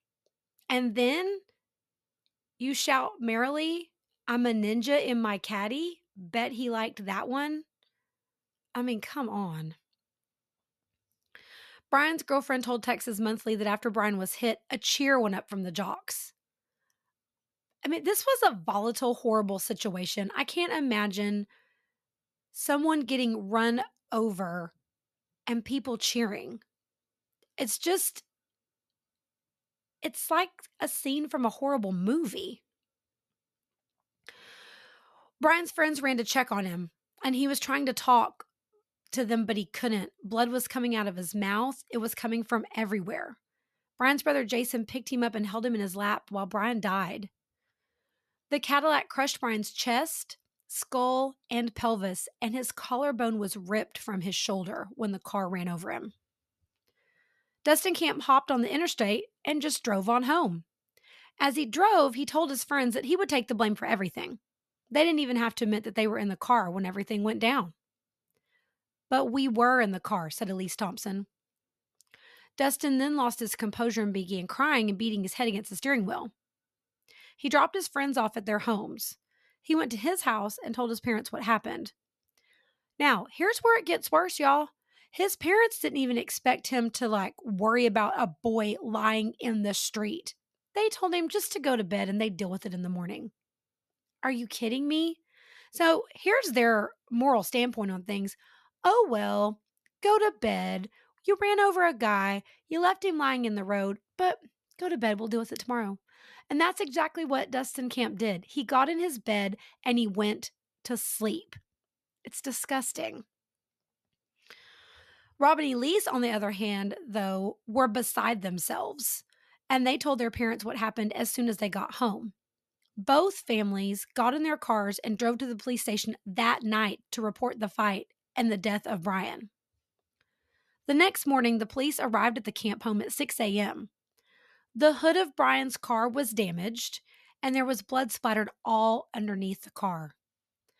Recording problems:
none

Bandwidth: 13.5 kHz